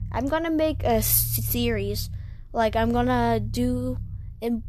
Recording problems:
low rumble; faint; throughout; 20 dB below the speech

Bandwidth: 13.5 kHz